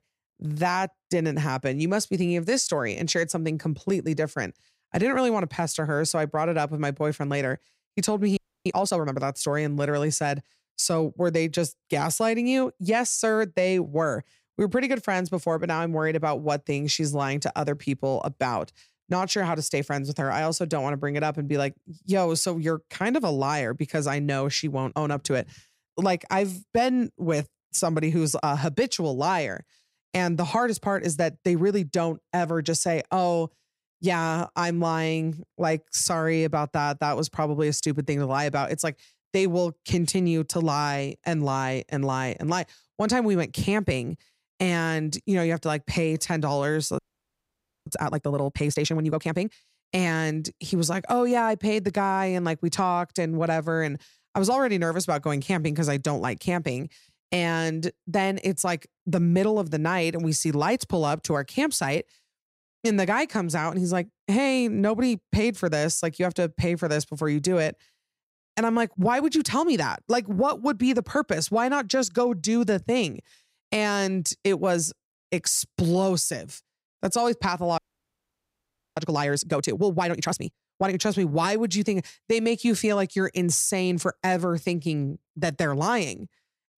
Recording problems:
audio freezing; at 8.5 s, at 47 s for 1 s and at 1:18 for 1 s

